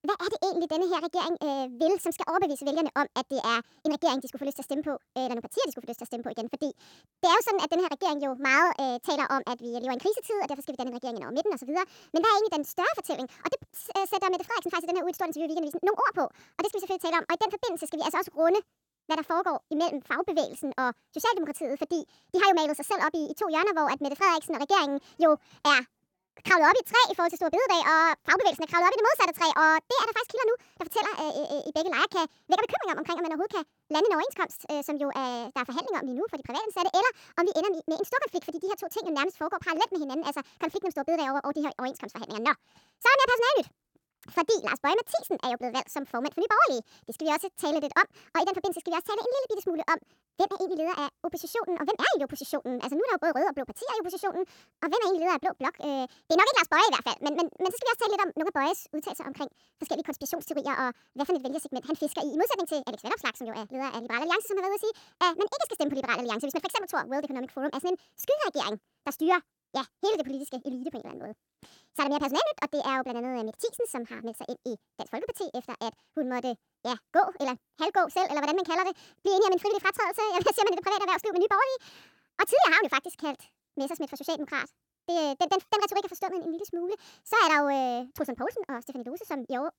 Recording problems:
wrong speed and pitch; too fast and too high; 1.6 times normal speed

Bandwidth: 17.5 kHz